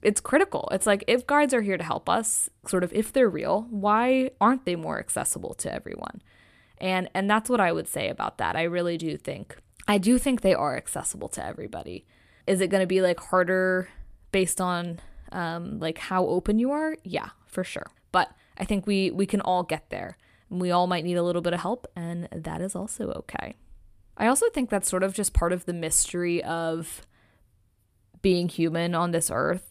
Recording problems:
none

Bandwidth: 14.5 kHz